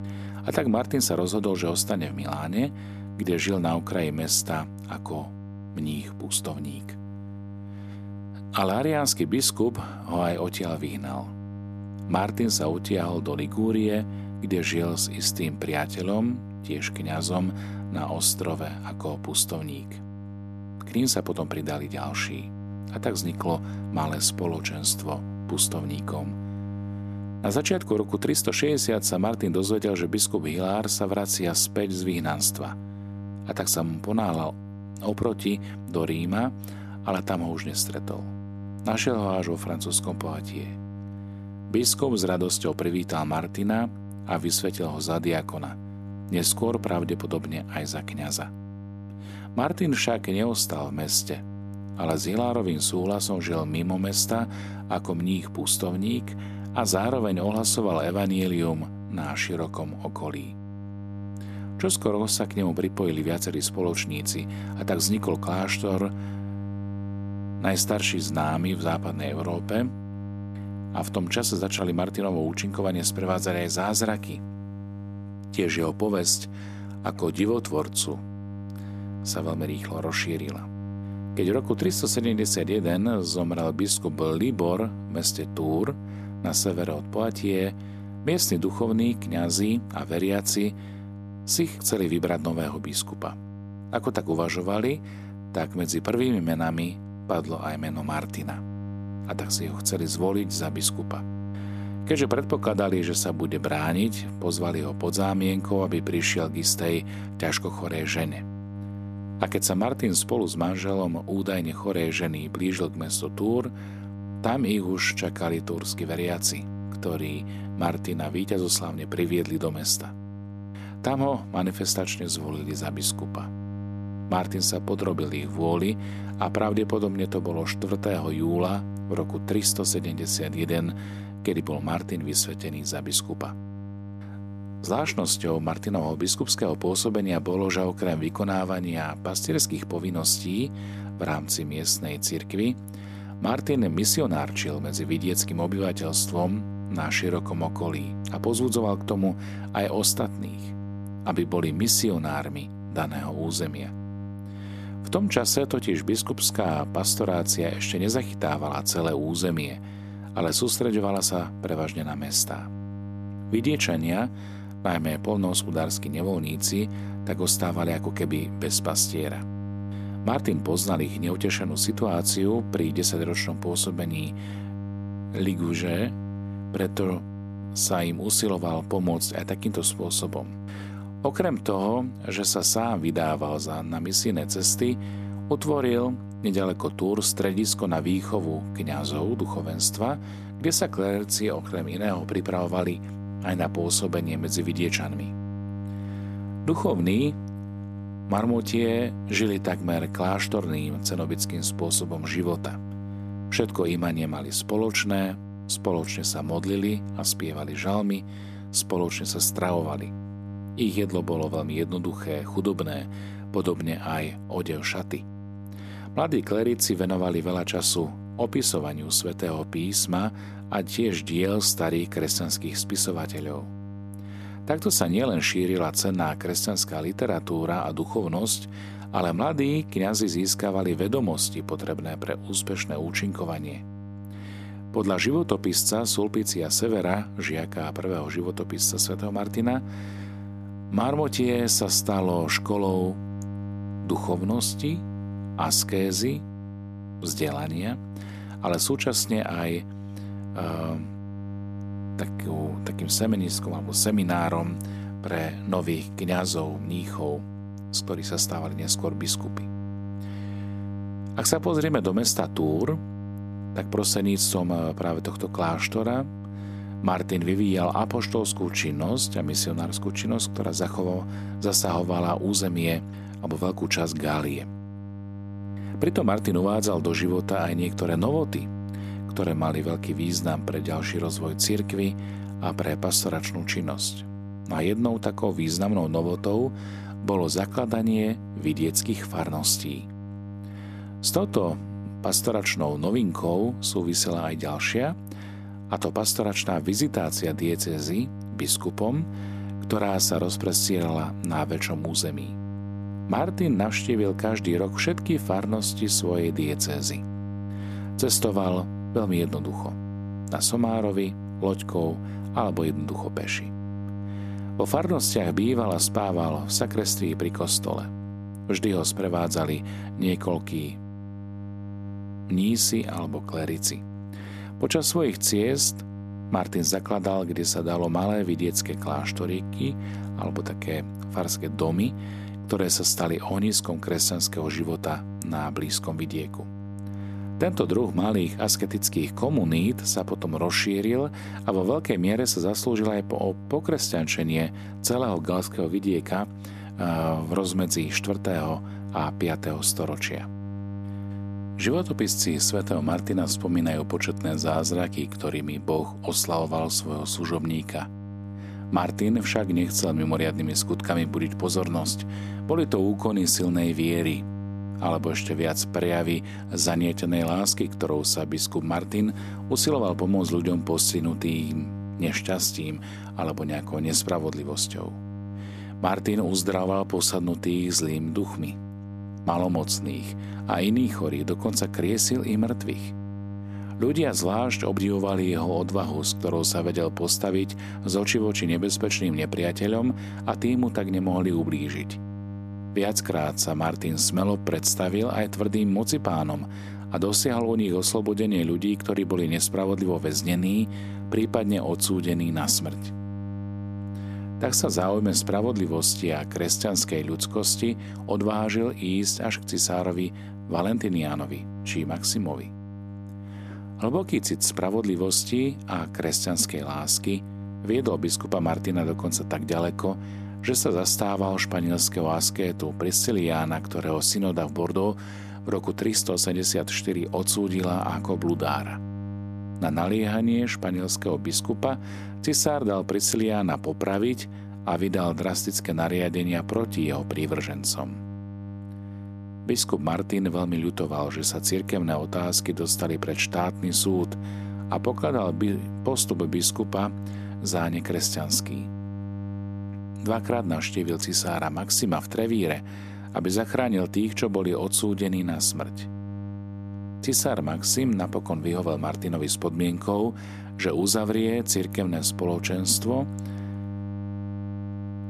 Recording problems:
electrical hum; noticeable; throughout; 50 Hz, 15 dB below the speech

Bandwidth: 14 kHz